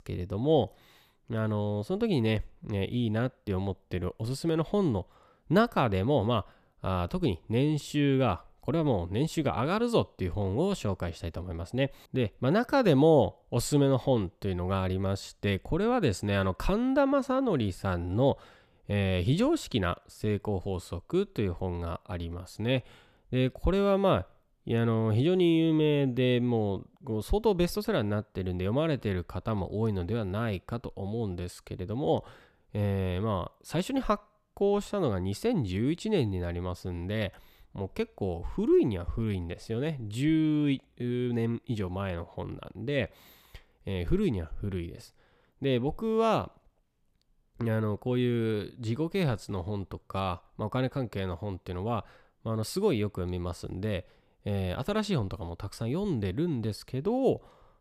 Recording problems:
none

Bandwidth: 14.5 kHz